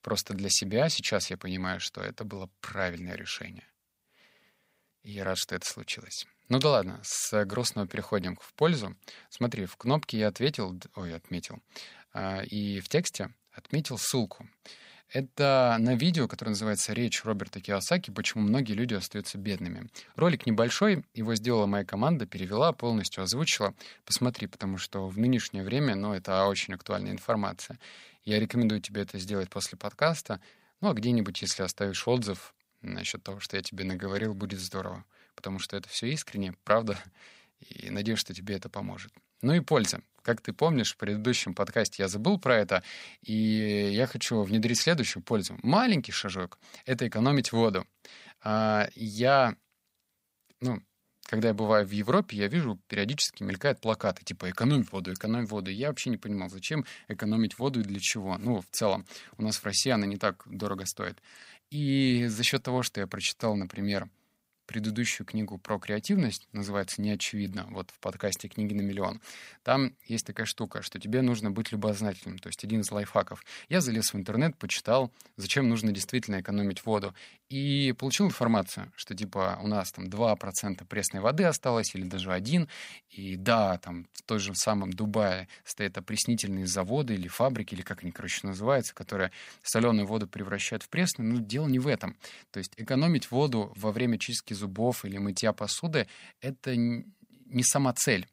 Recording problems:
none

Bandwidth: 15.5 kHz